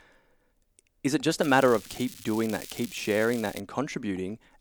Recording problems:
crackling; noticeable; from 1.5 to 3.5 s; 15 dB below the speech

